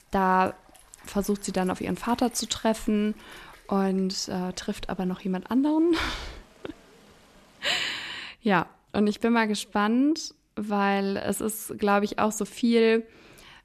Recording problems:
rain or running water; faint; until 8 s; 25 dB below the speech

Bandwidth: 13.5 kHz